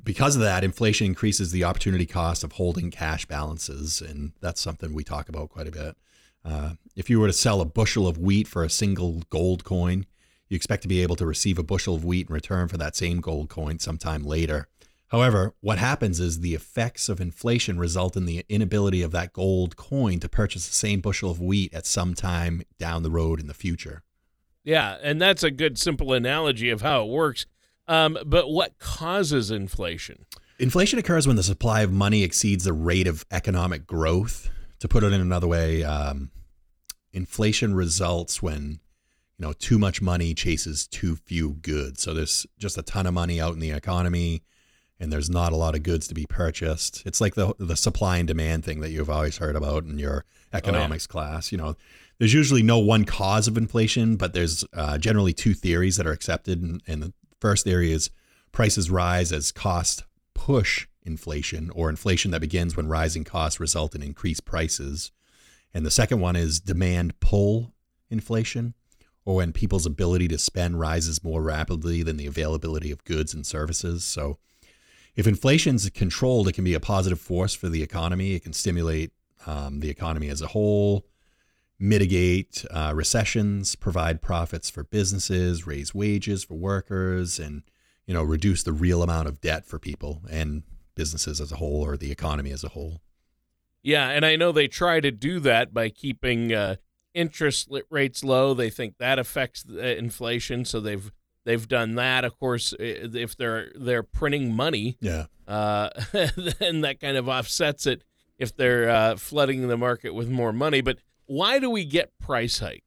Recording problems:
none

